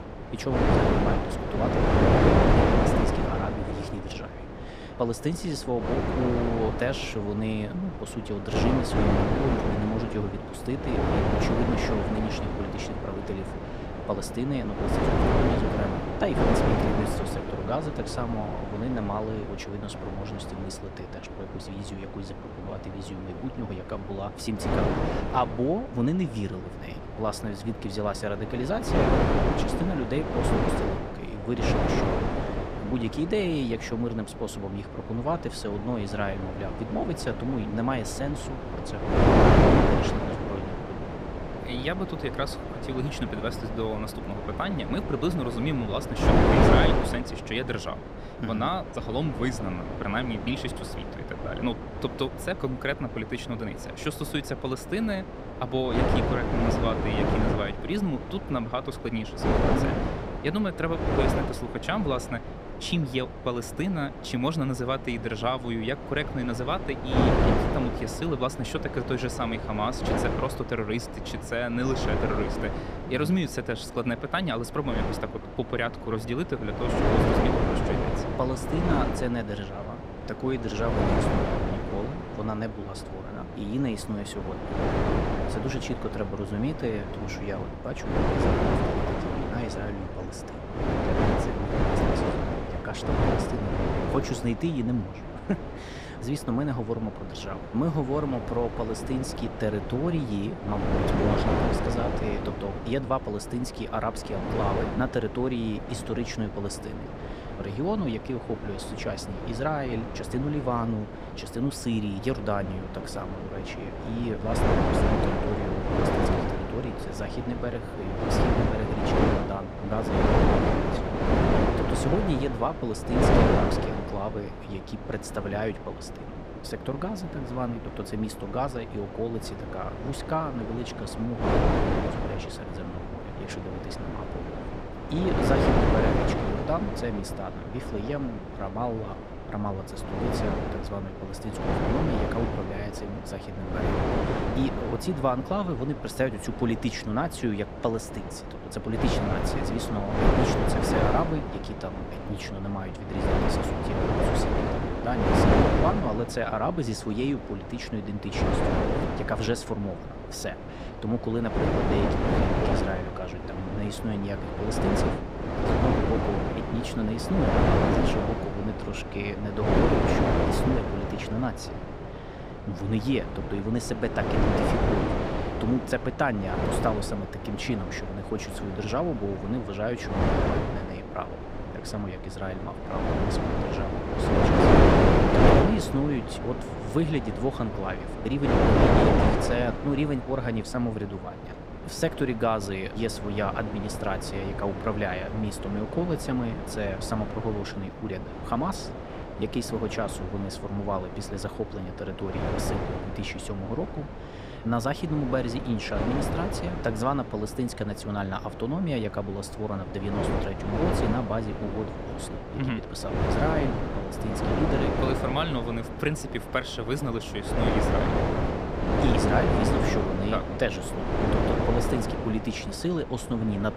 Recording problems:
wind noise on the microphone; heavy; 3 dB above the speech

